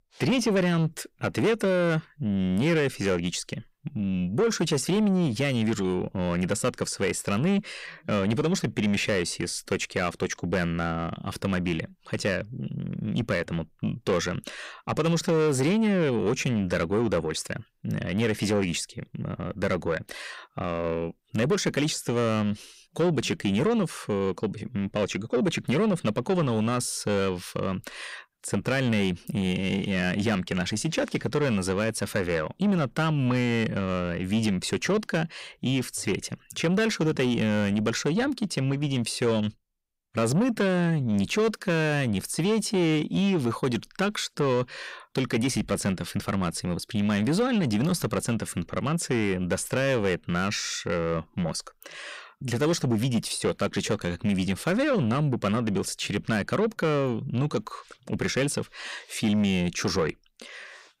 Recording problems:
distortion; slight; 10 dB below the speech

